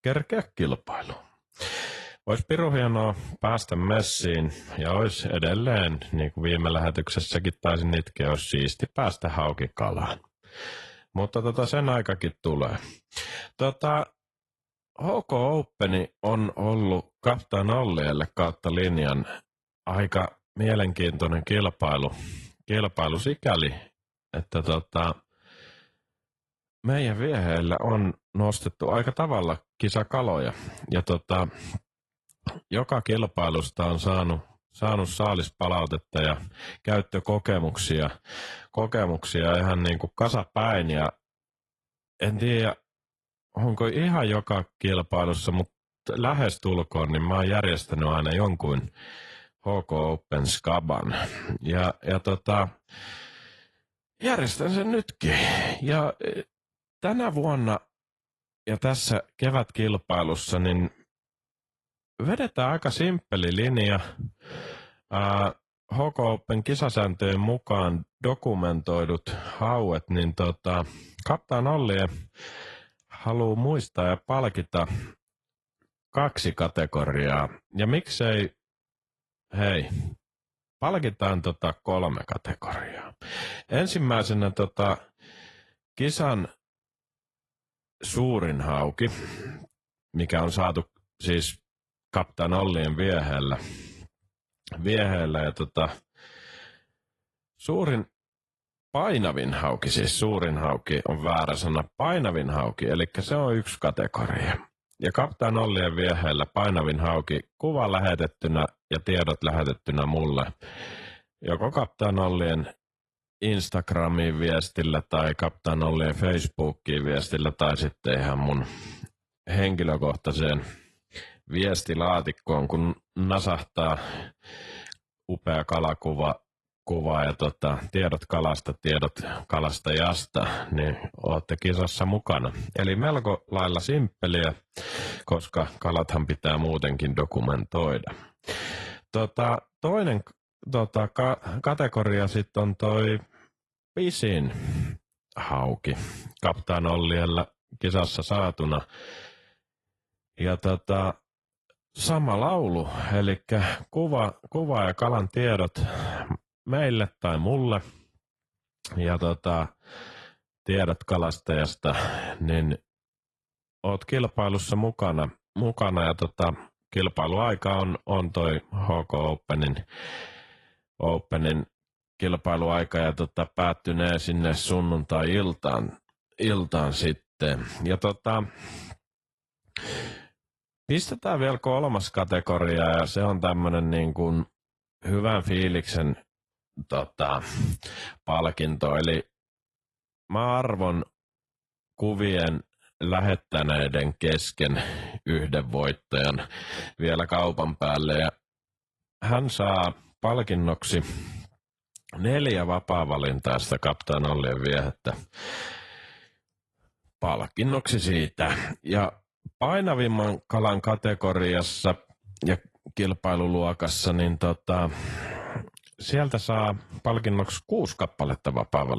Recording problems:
garbled, watery; slightly; nothing above 11.5 kHz
abrupt cut into speech; at the end

